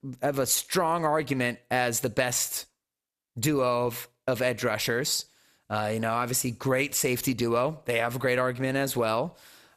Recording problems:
squashed, flat; somewhat

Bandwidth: 14.5 kHz